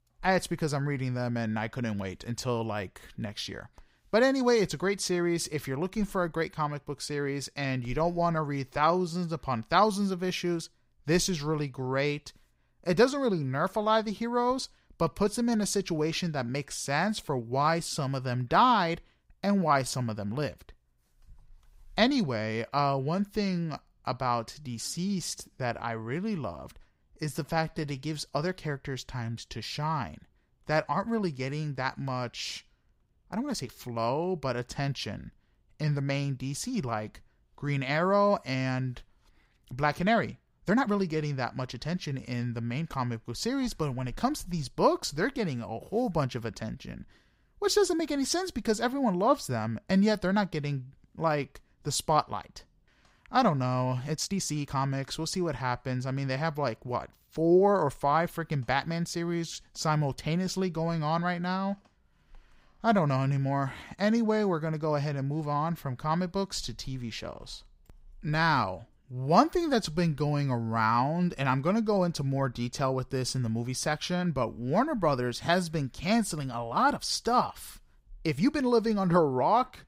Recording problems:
uneven, jittery; strongly; from 8.5 s to 1:19

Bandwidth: 15.5 kHz